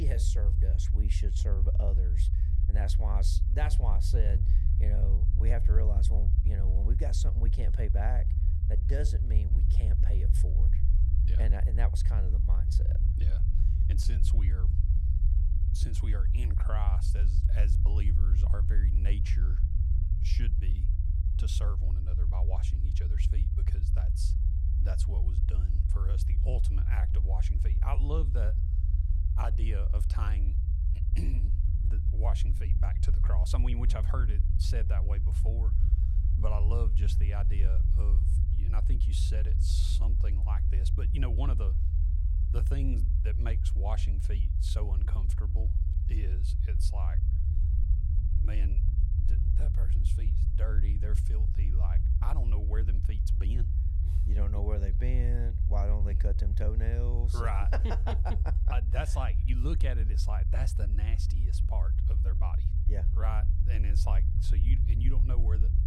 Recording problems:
low rumble; loud; throughout; 4 dB below the speech
abrupt cut into speech; at the start

